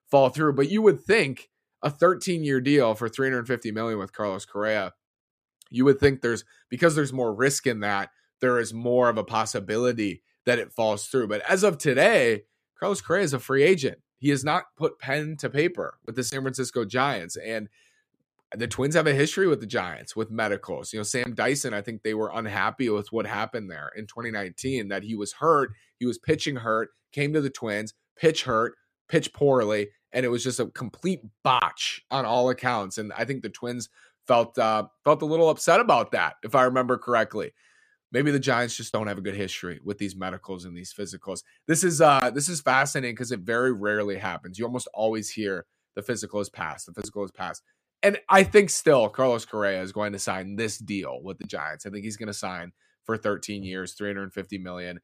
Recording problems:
none

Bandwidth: 14.5 kHz